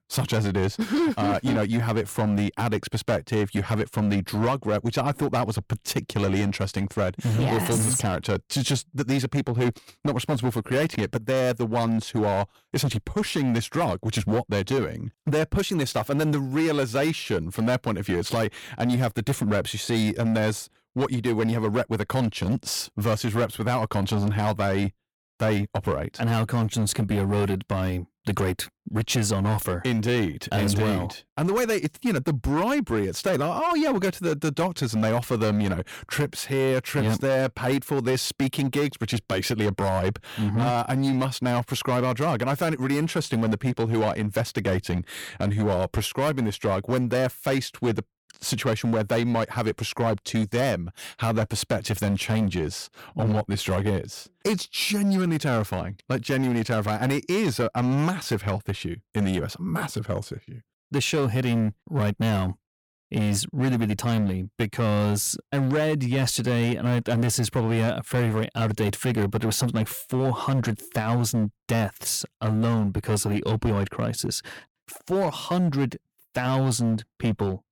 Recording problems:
distortion; slight; 12% of the sound clipped

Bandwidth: 18.5 kHz